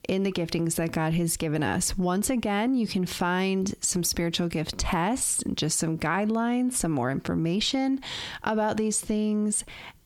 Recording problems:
squashed, flat; heavily

